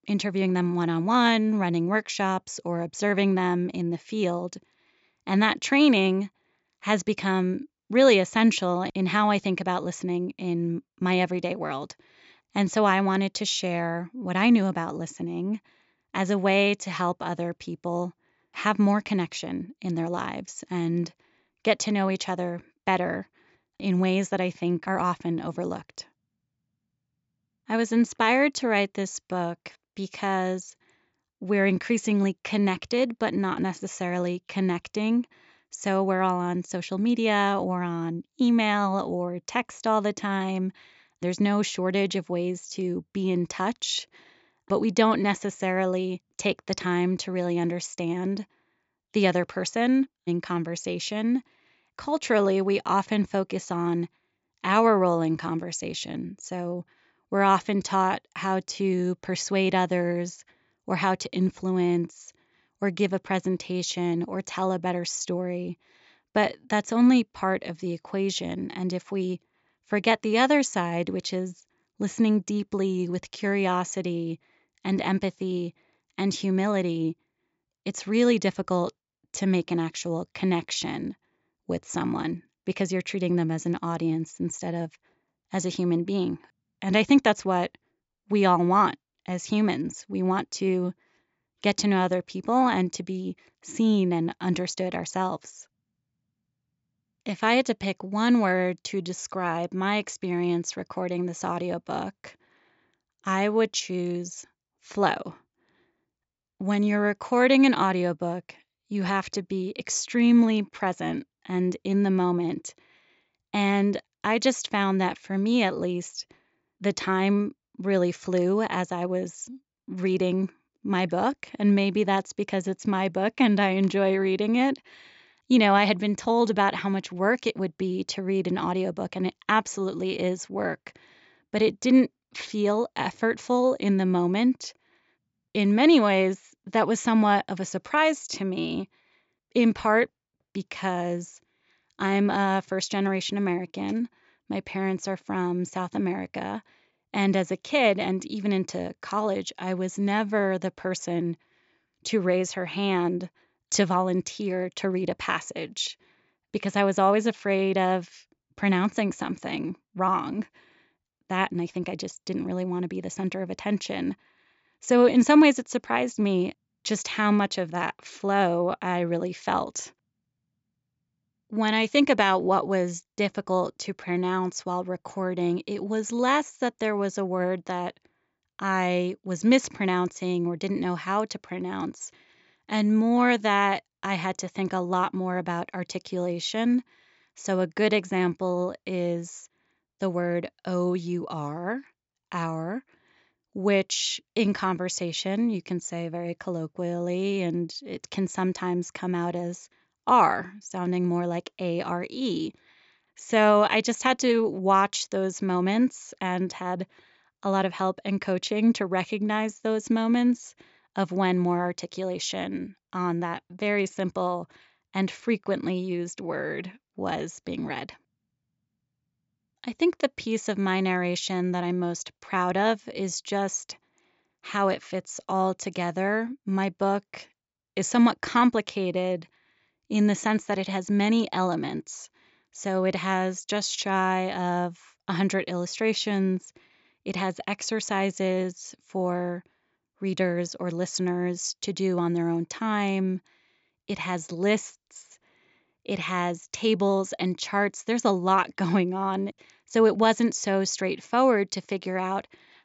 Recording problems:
high frequencies cut off; noticeable; nothing above 8 kHz

